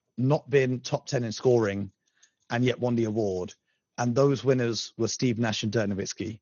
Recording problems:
garbled, watery; slightly; nothing above 6.5 kHz

